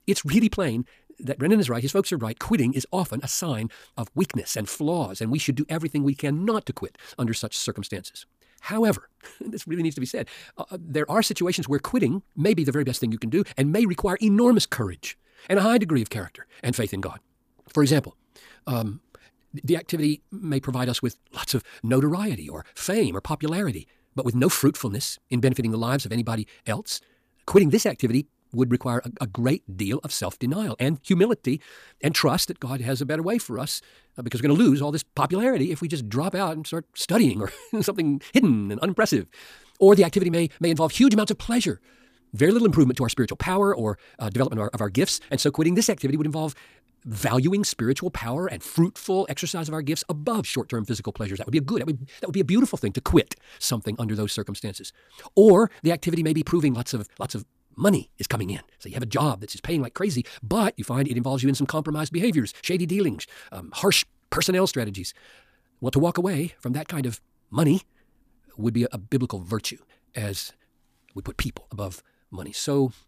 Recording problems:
wrong speed, natural pitch; too fast; 1.7 times normal speed

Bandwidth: 15 kHz